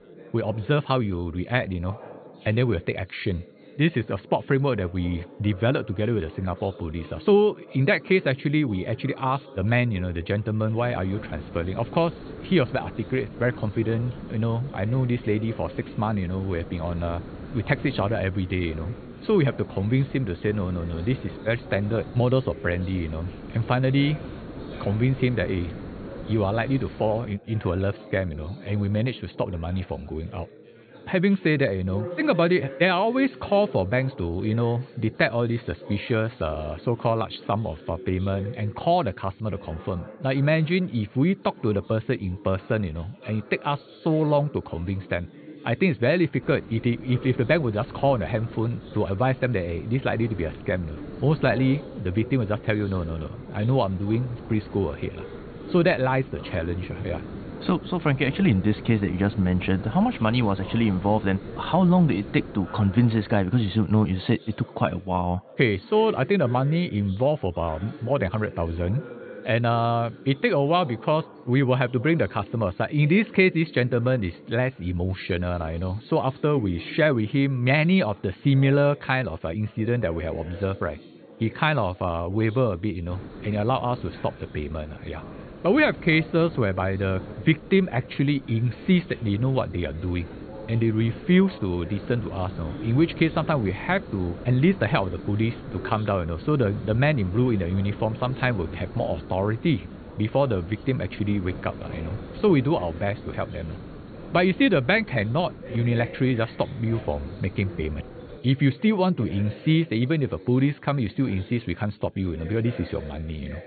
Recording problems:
high frequencies cut off; severe; nothing above 4.5 kHz
chatter from many people; noticeable; throughout; 20 dB below the speech
hiss; noticeable; from 11 to 27 s, from 46 s to 1:04 and from 1:23 to 1:48; 15 dB below the speech

